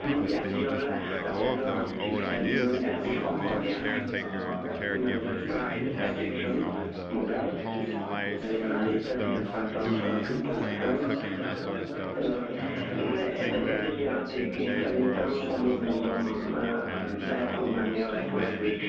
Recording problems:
muffled; slightly; fading above 3.5 kHz
chatter from many people; very loud; throughout; 6 dB above the speech
rain or running water; faint; throughout; 20 dB below the speech

